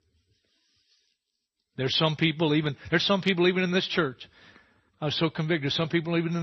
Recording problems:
garbled, watery; slightly
abrupt cut into speech; at the end

